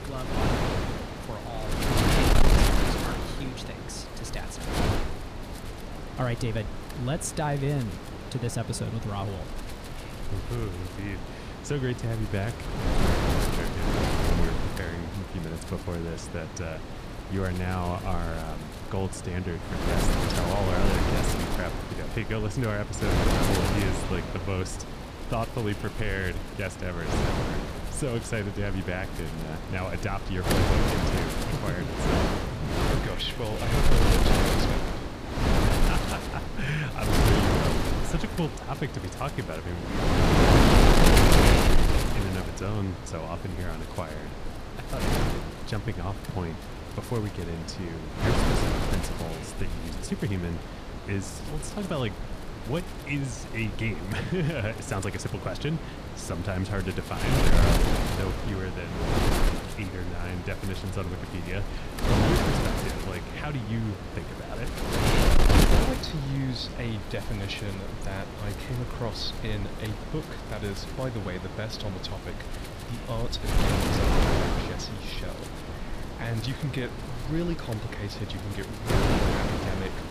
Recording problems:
wind noise on the microphone; heavy; 4 dB above the speech

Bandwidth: 15 kHz